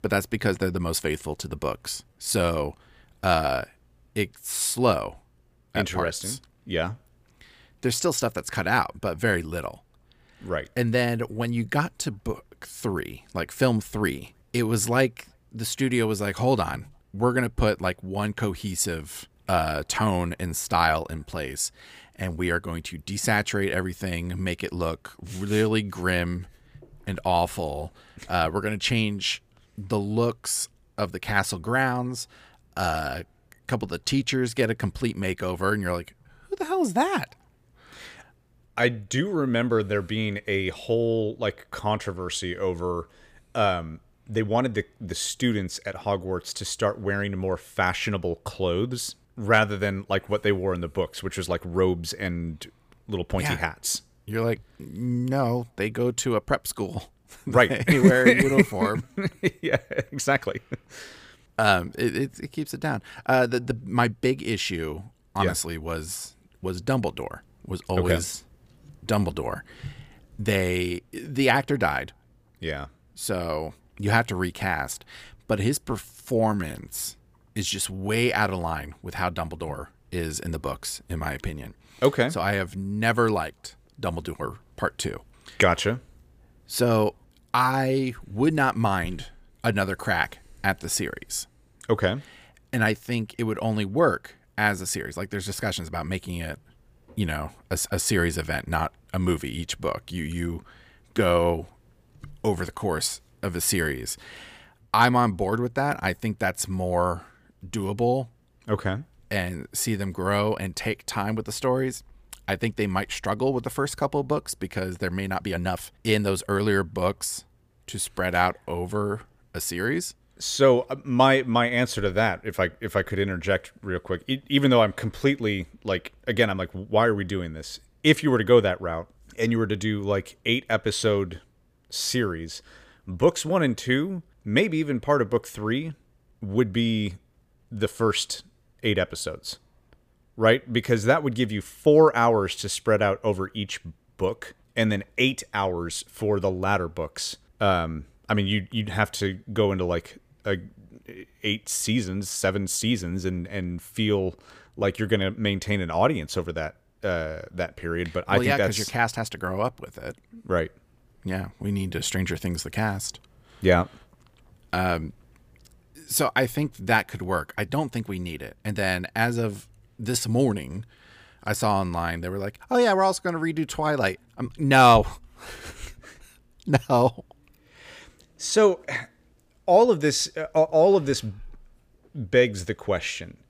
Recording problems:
uneven, jittery; strongly; from 2 s to 2:55

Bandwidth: 15 kHz